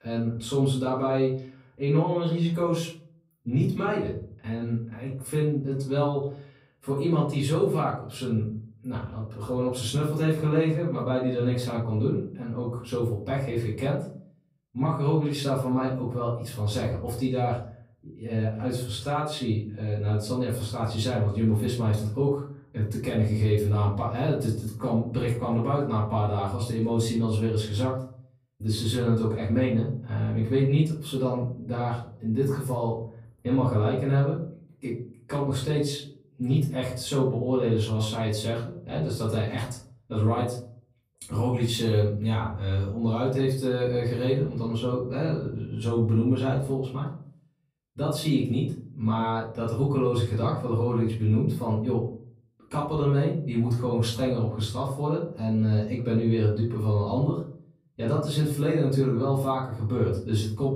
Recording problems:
off-mic speech; far
room echo; noticeable; dies away in 0.5 s

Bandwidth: 15.5 kHz